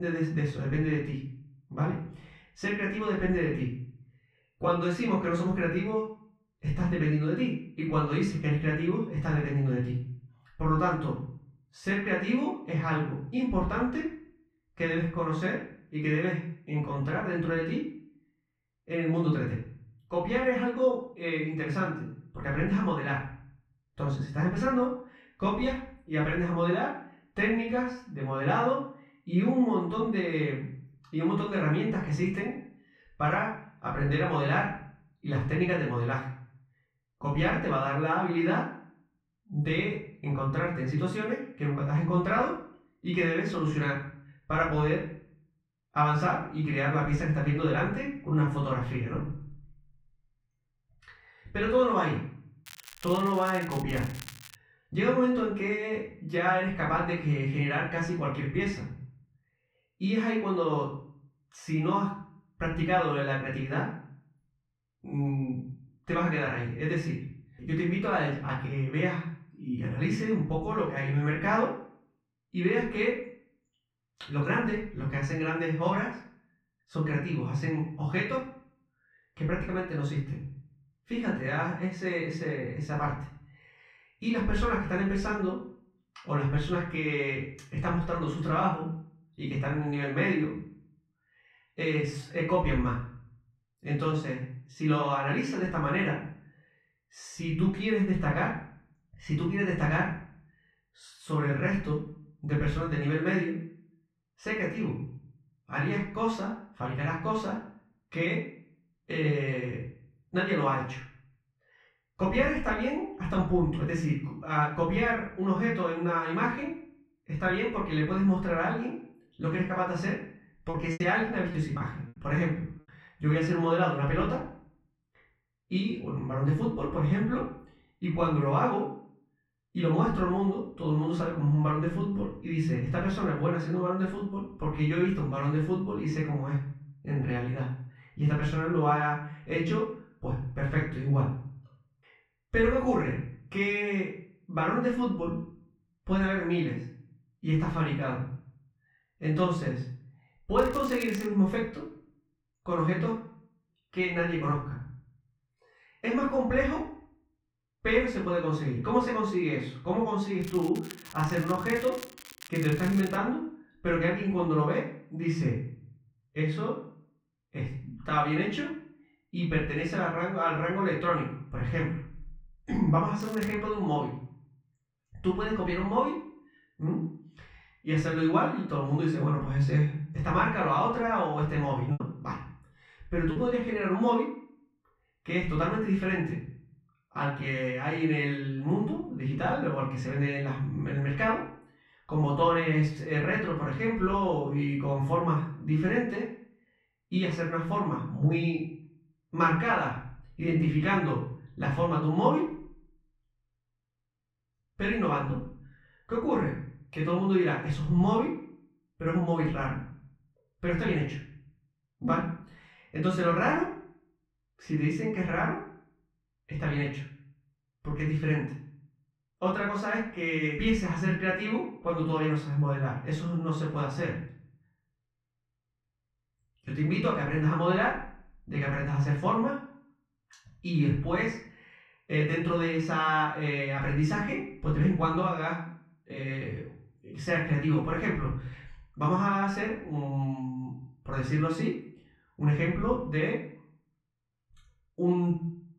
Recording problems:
off-mic speech; far
muffled; very; fading above 2 kHz
room echo; noticeable; dies away in 0.5 s
crackling; noticeable; 4 times, first at 53 s; 15 dB below the speech
abrupt cut into speech; at the start
choppy; occasionally; from 2:01 to 2:02 and from 3:02 to 3:03; 5% of the speech affected

